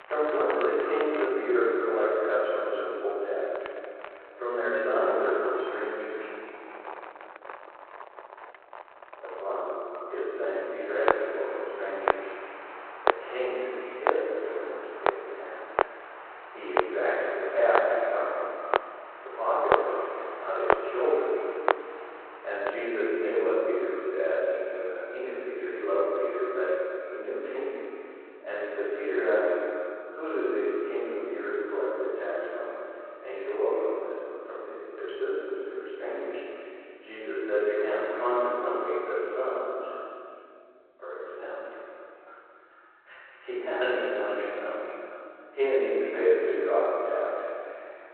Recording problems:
echo of what is said; strong; throughout; 220 ms later, 10 dB below the speech
room echo; strong; dies away in 2.4 s
off-mic speech; far
phone-call audio; nothing above 4 kHz
muffled; very slightly; fading above 2.5 kHz
household noises; loud; until 23 s; 3 dB below the speech

